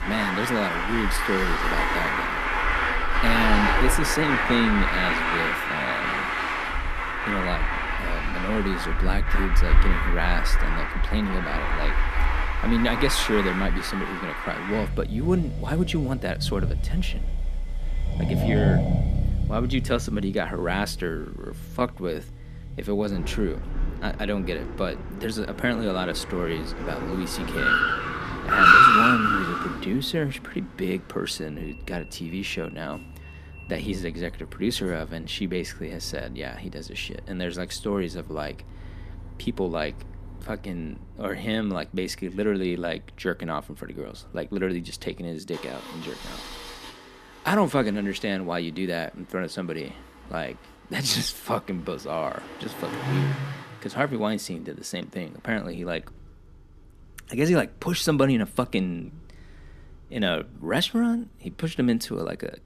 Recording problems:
traffic noise; very loud; throughout; 4 dB above the speech

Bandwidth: 14.5 kHz